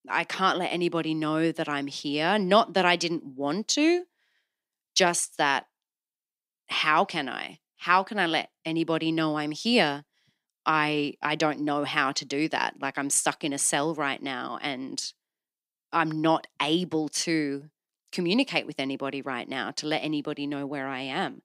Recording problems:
none

